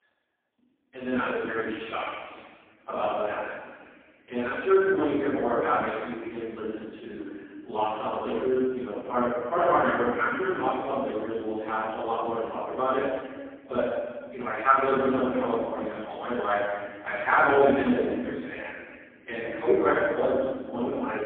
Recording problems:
phone-call audio; poor line
room echo; strong; dies away in 1.4 s
off-mic speech; far

